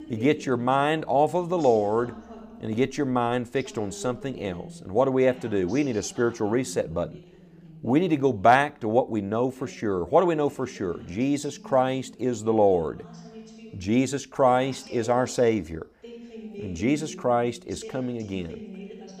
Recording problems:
voice in the background; noticeable; throughout; 20 dB below the speech

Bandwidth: 15 kHz